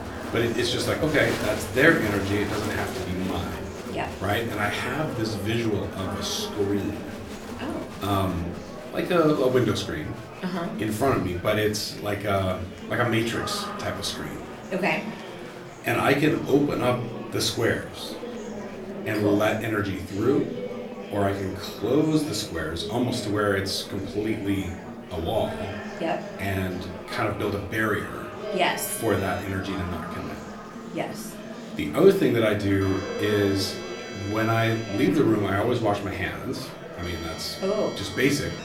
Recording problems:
room echo; slight; dies away in 0.3 s
off-mic speech; somewhat distant
murmuring crowd; loud; throughout; 10 dB below the speech
background music; noticeable; throughout; 15 dB below the speech

